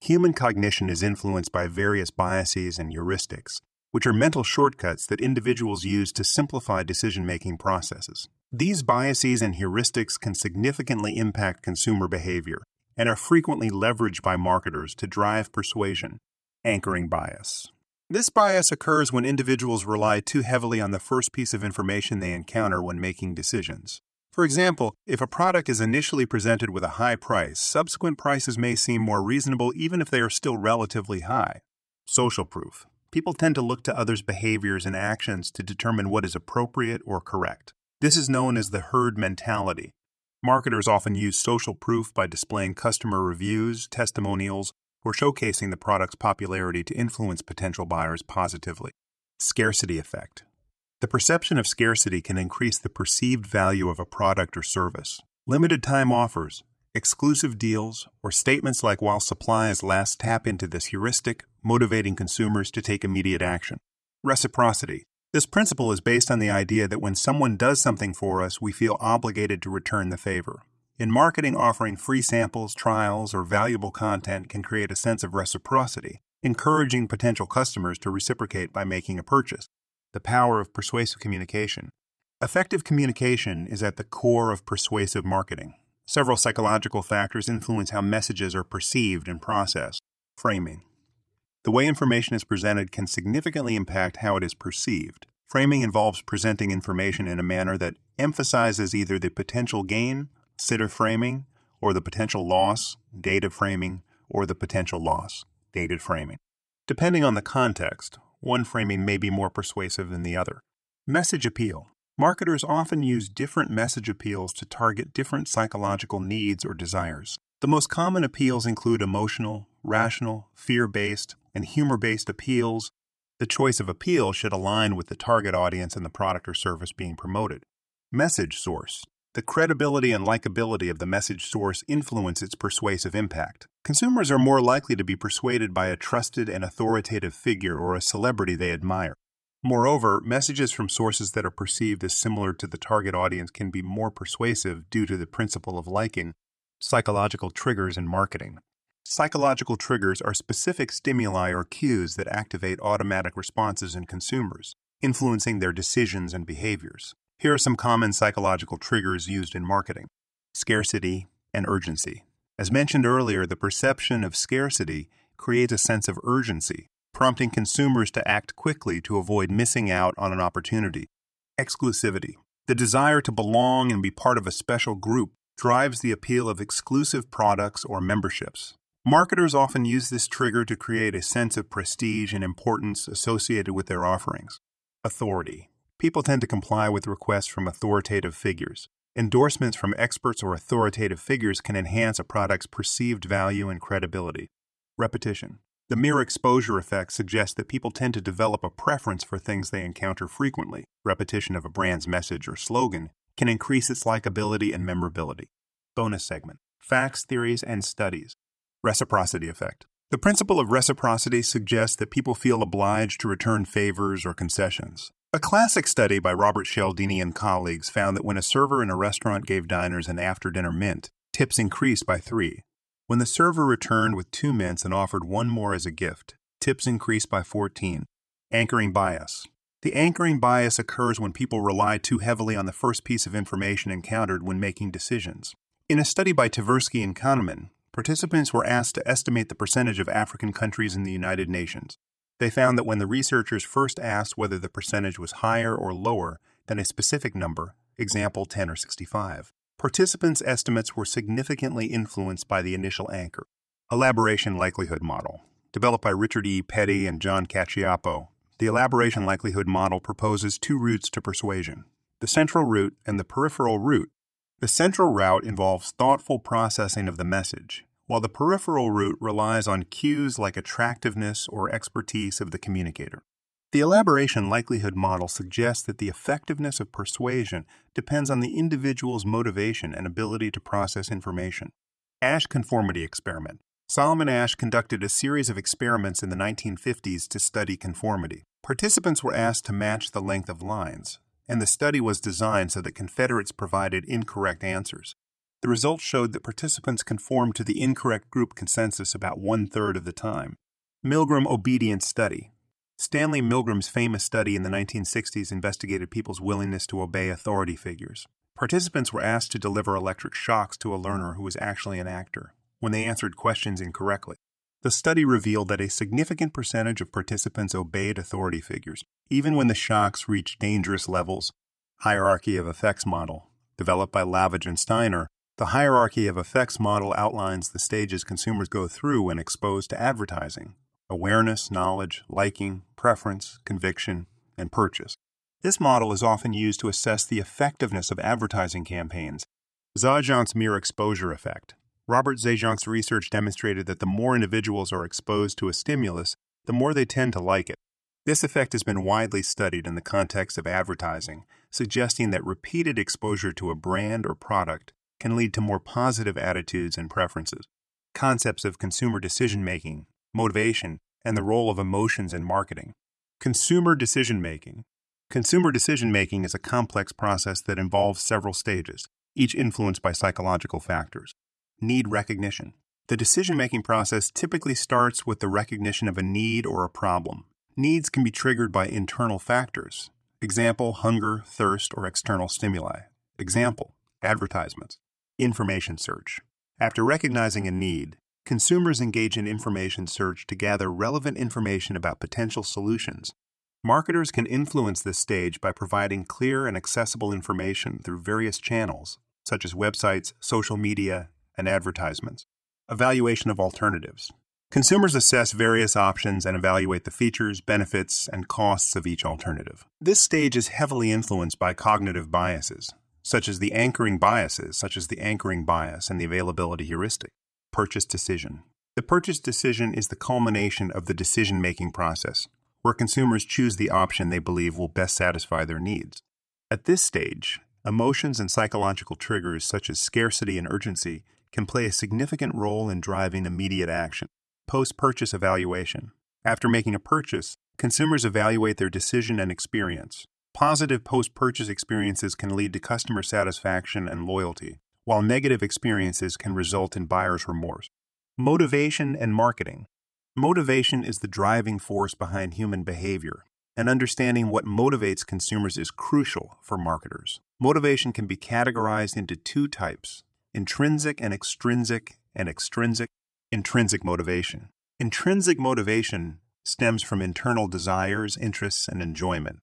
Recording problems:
none

